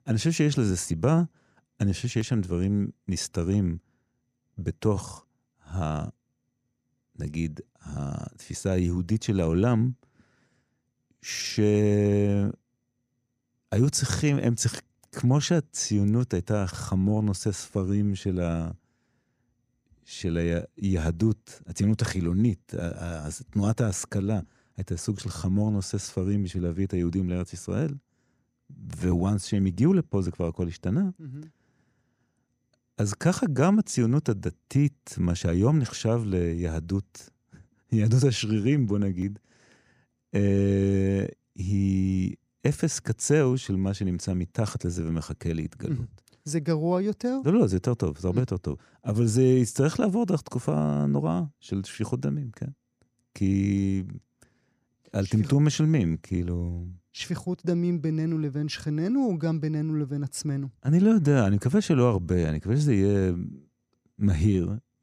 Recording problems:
none

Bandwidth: 15 kHz